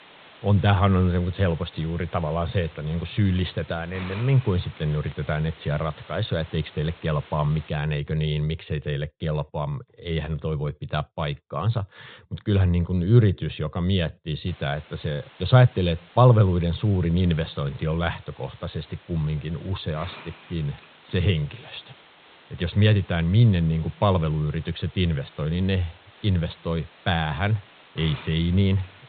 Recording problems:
high frequencies cut off; severe; nothing above 4 kHz
hiss; faint; until 7.5 s and from 14 s on; 20 dB below the speech

